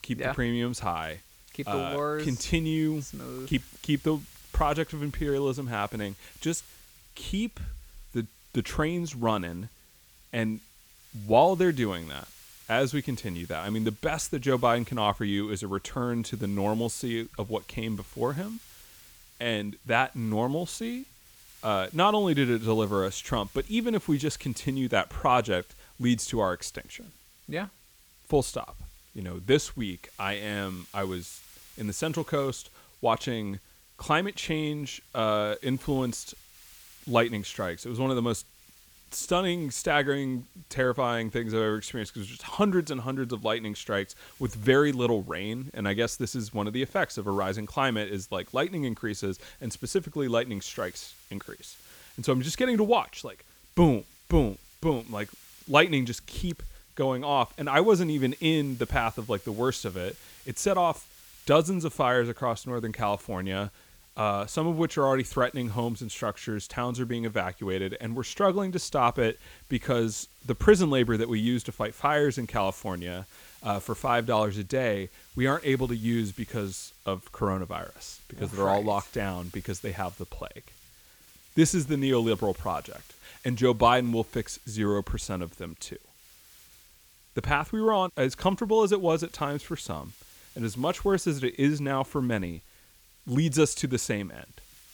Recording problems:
hiss; faint; throughout; 25 dB below the speech

